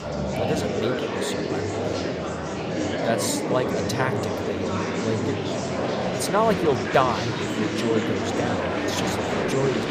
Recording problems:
murmuring crowd; very loud; throughout; 2 dB above the speech

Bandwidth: 15 kHz